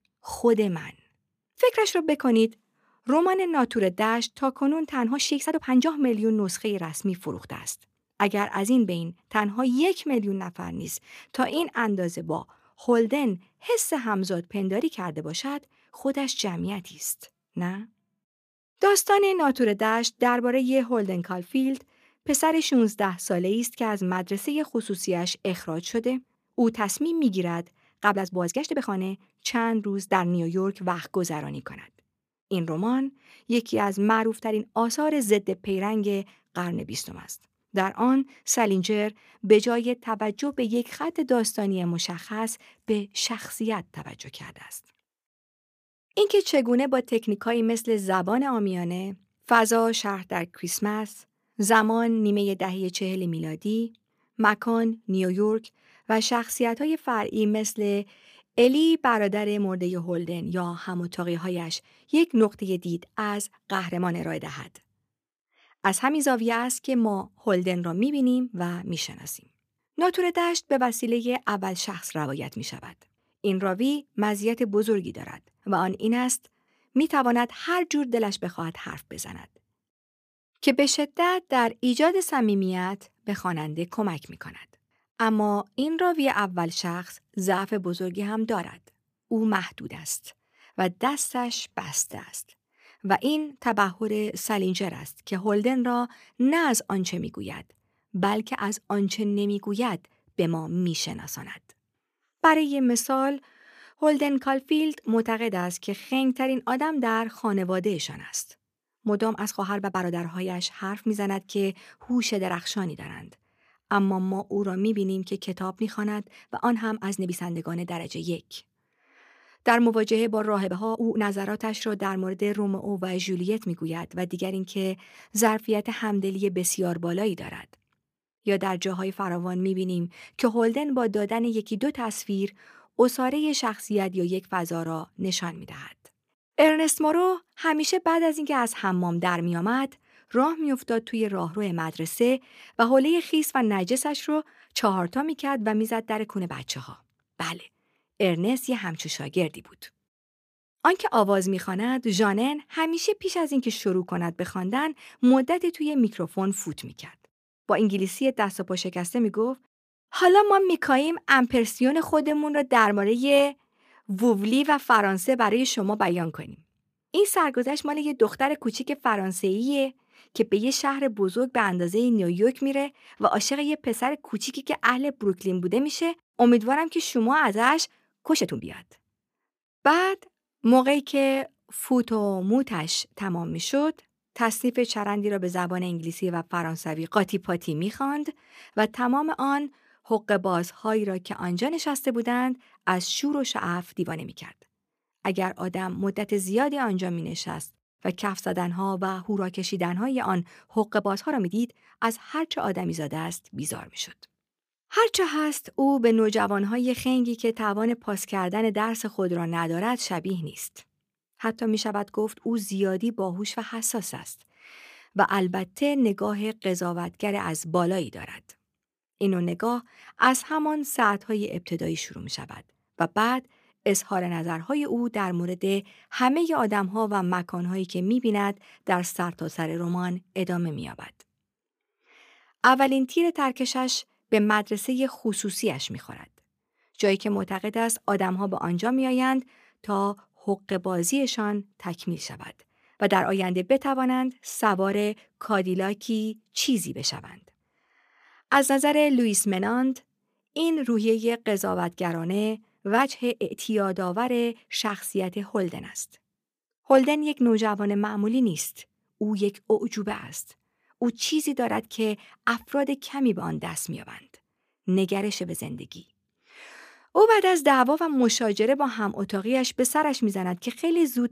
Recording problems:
uneven, jittery; strongly; from 5 s to 4:14

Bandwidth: 15 kHz